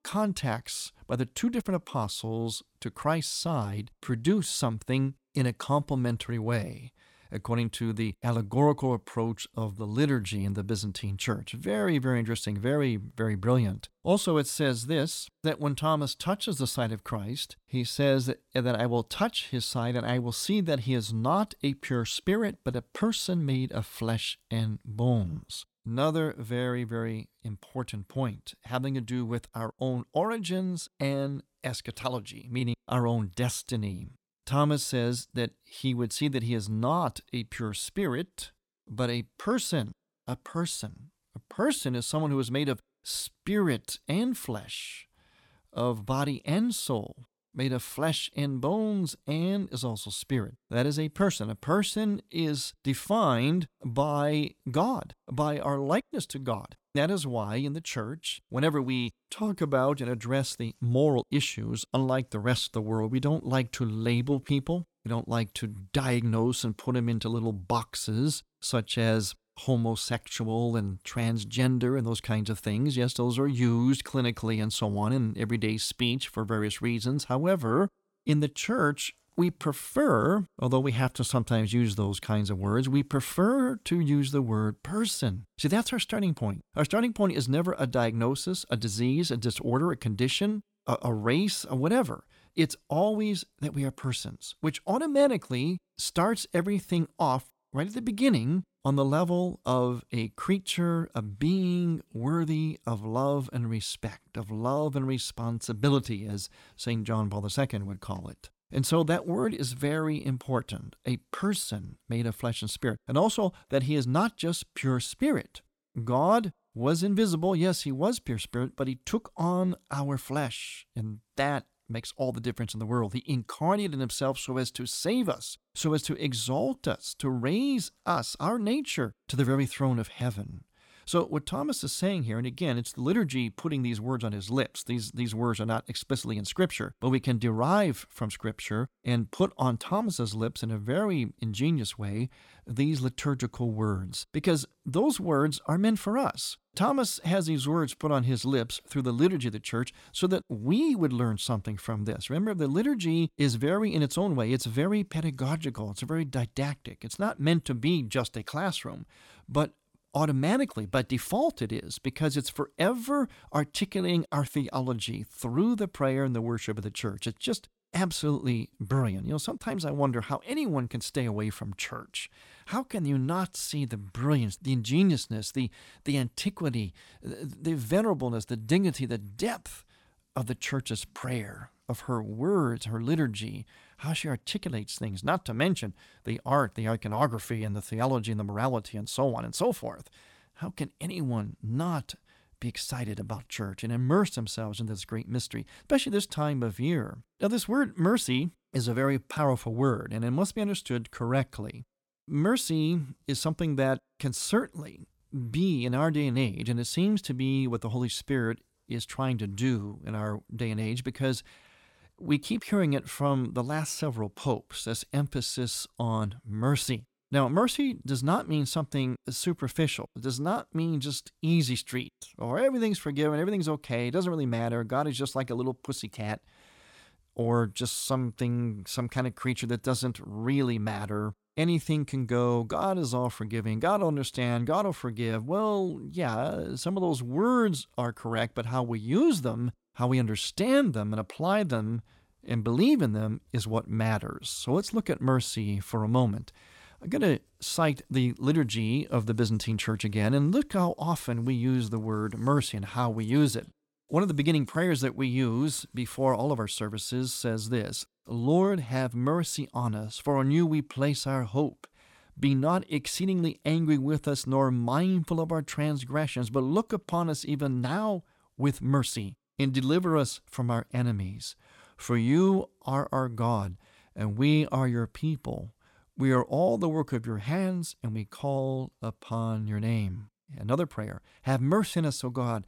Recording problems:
none

